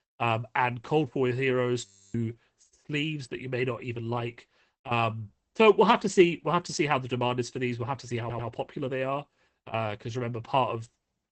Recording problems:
garbled, watery; badly; nothing above 8 kHz
audio freezing; at 2 s
audio stuttering; at 8 s

